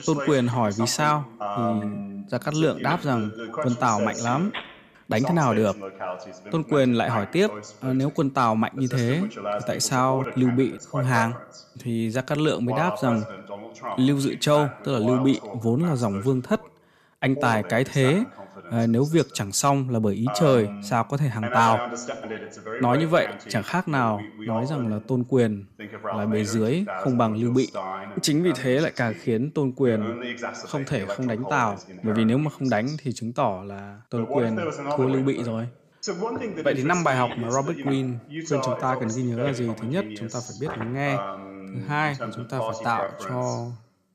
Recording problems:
voice in the background; loud; throughout; 9 dB below the speech

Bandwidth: 14.5 kHz